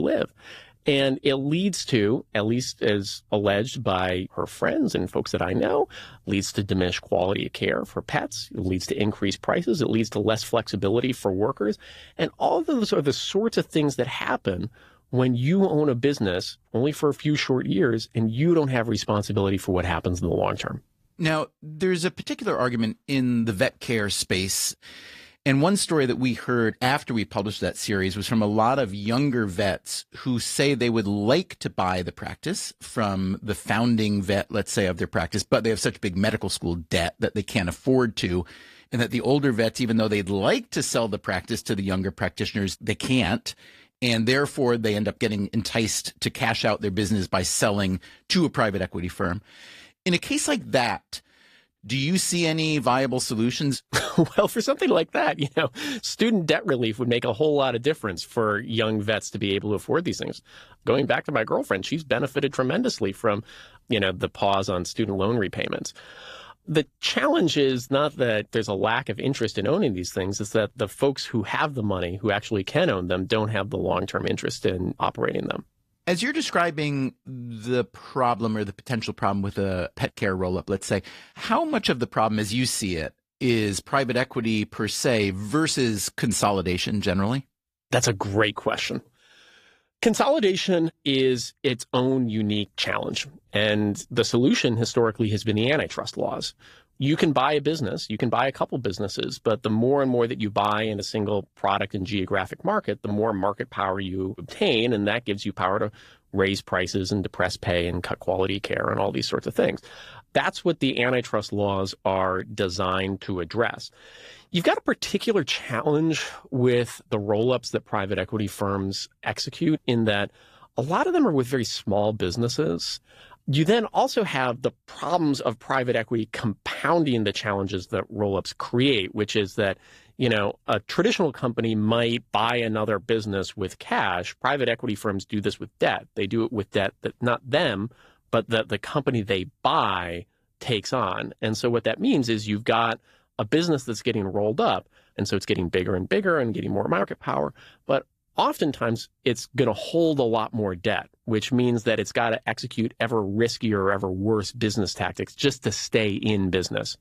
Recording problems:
garbled, watery; slightly; nothing above 14.5 kHz
abrupt cut into speech; at the start

